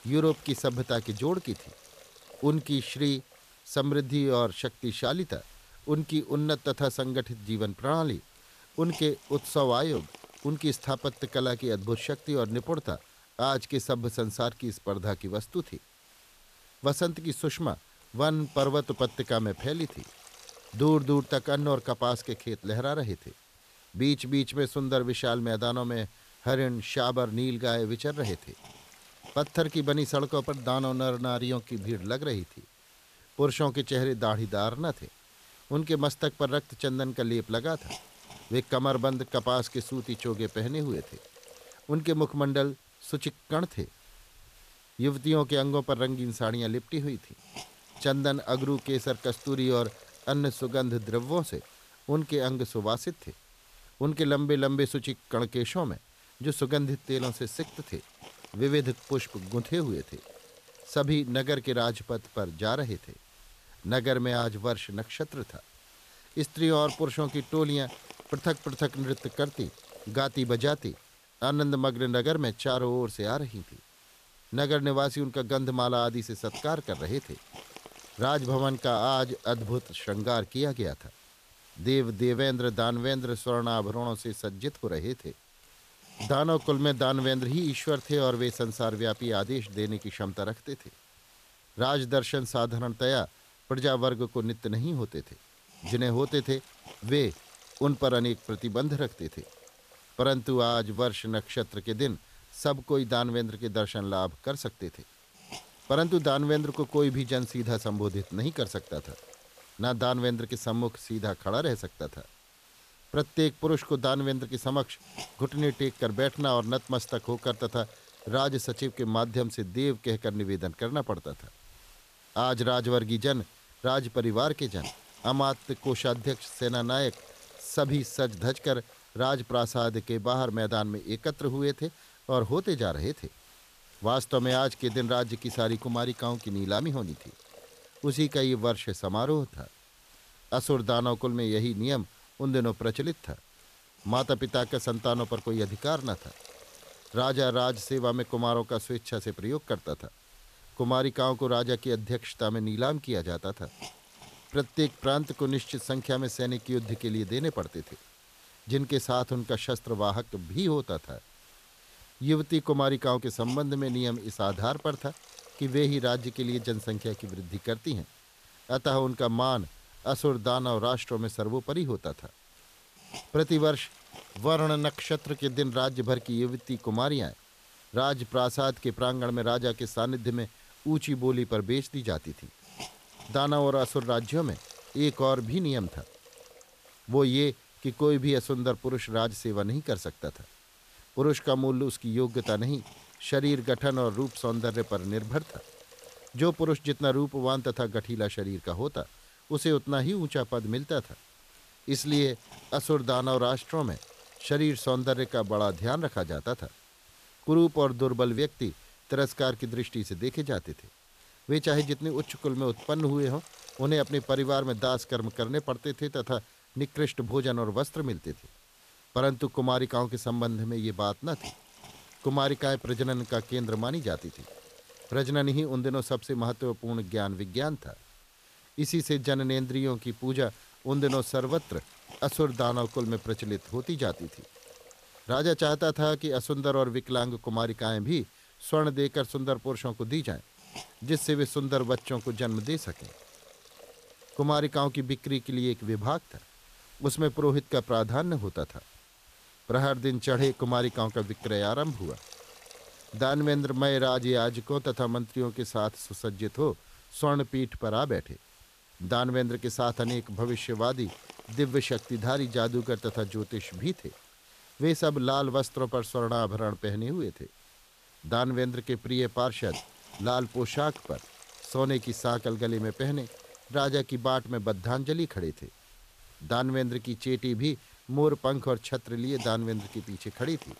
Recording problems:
hiss; faint; throughout; 20 dB below the speech

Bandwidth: 14.5 kHz